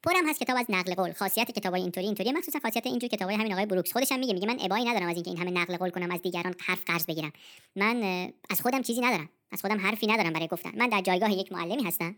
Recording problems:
wrong speed and pitch; too fast and too high; 1.5 times normal speed

